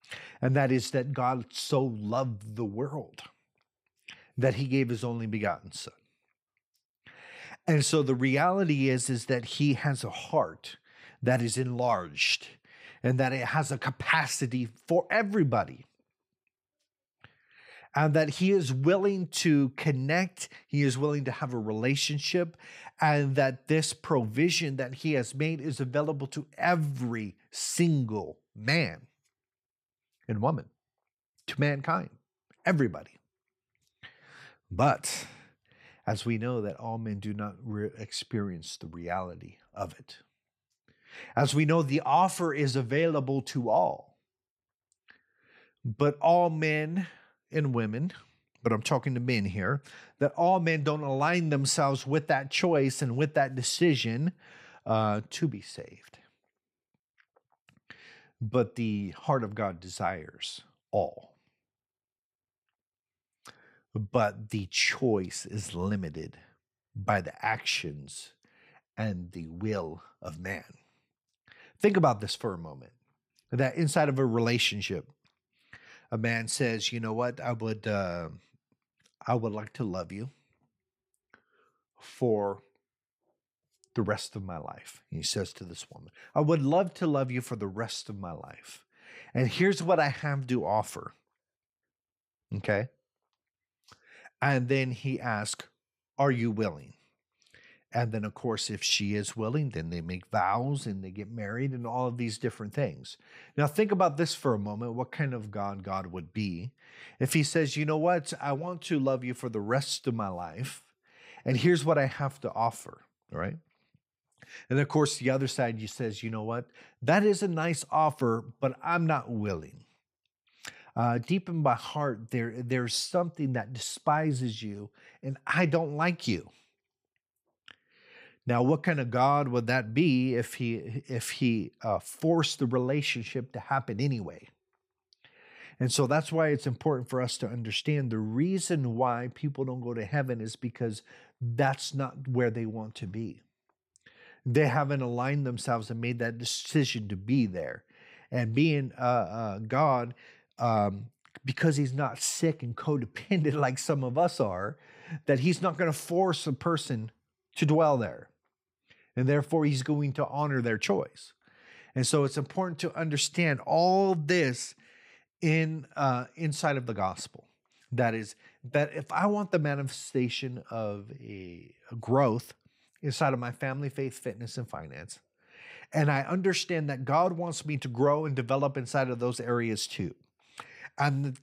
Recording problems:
none

